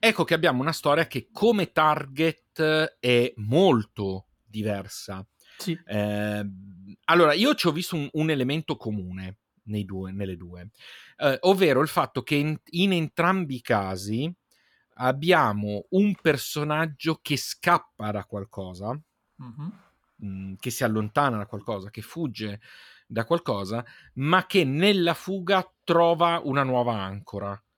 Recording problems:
none

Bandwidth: 18.5 kHz